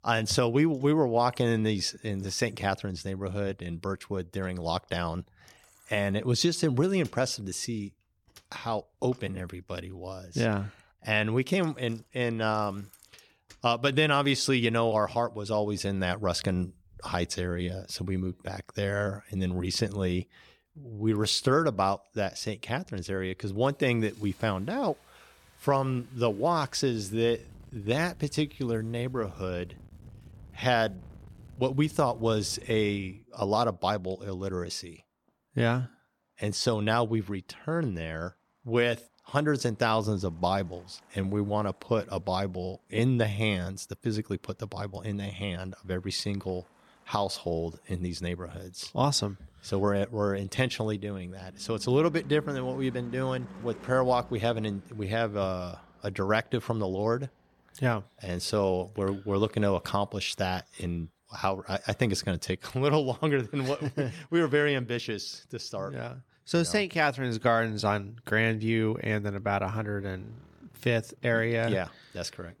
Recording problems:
traffic noise; faint; throughout; 25 dB below the speech

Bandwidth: 18 kHz